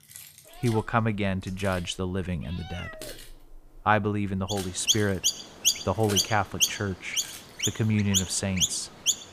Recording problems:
animal sounds; very loud; throughout; 1 dB above the speech
jangling keys; noticeable; until 7.5 s; peak 9 dB below the speech

